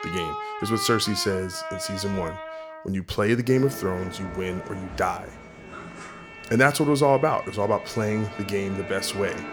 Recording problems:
background music; noticeable; throughout; 10 dB below the speech

